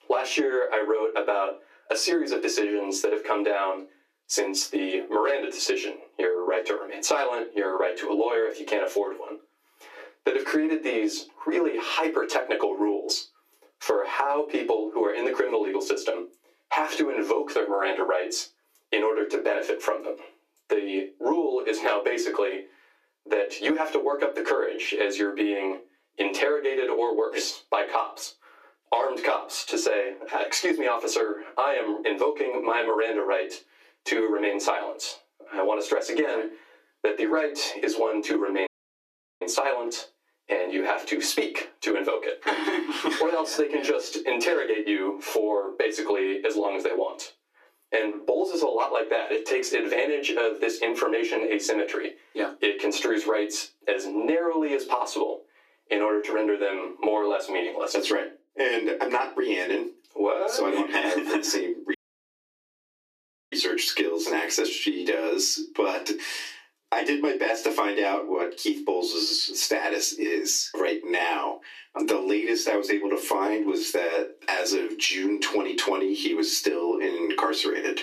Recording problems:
off-mic speech; far
squashed, flat; heavily
thin; somewhat; fading below 300 Hz
room echo; very slight; dies away in 0.2 s
audio cutting out; at 39 s for 0.5 s and at 1:02 for 1.5 s

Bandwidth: 14.5 kHz